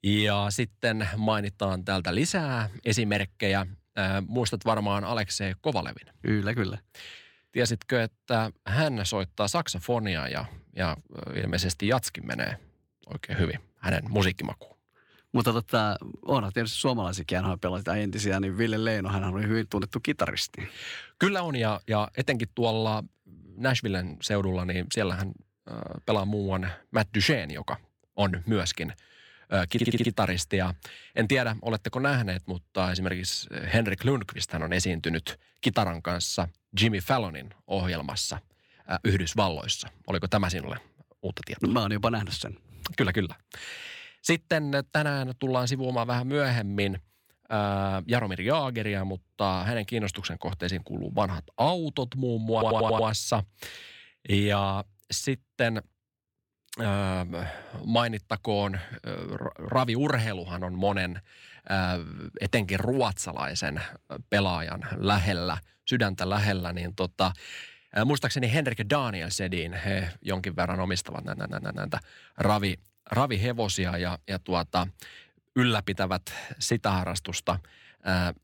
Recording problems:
audio stuttering; at 30 s, at 53 s and at 1:11

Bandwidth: 17 kHz